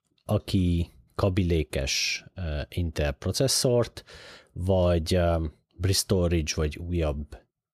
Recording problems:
none

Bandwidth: 14.5 kHz